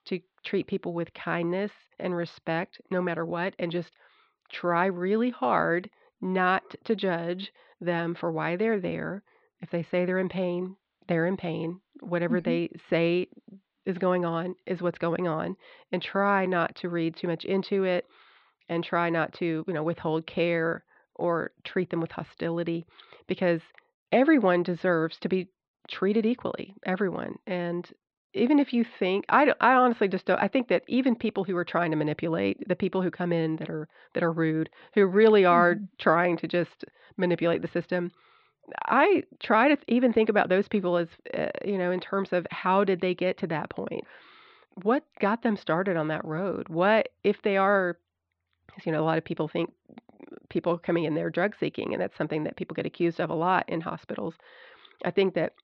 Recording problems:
muffled; slightly; fading above 4 kHz

